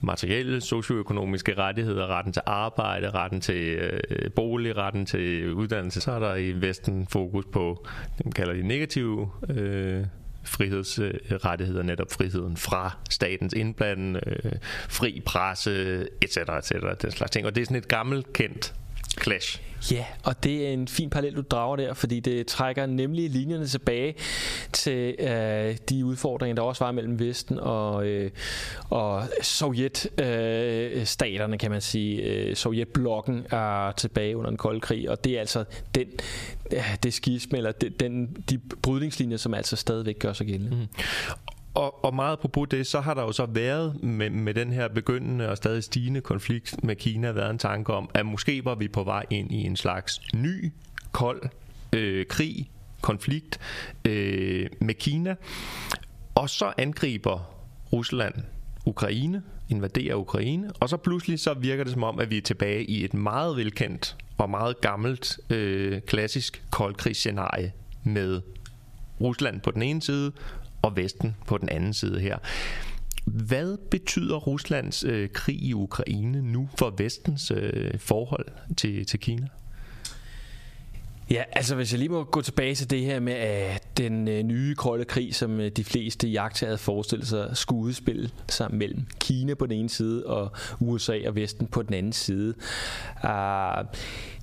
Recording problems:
squashed, flat; heavily

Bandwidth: 14.5 kHz